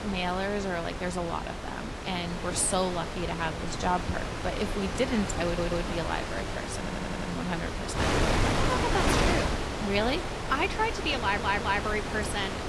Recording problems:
garbled, watery; slightly
wind noise on the microphone; heavy; 2 dB below the speech
audio stuttering; at 5.5 s, at 7 s and at 11 s

